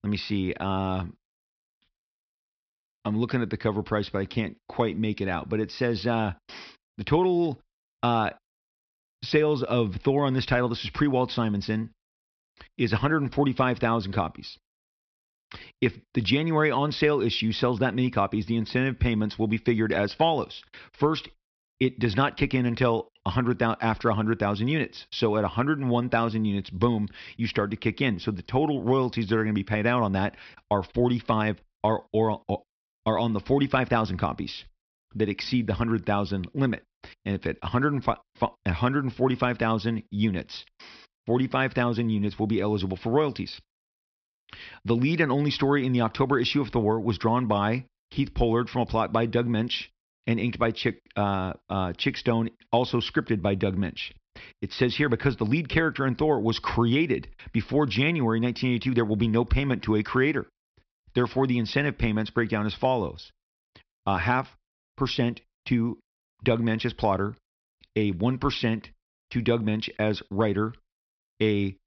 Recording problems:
high frequencies cut off; noticeable; nothing above 5.5 kHz

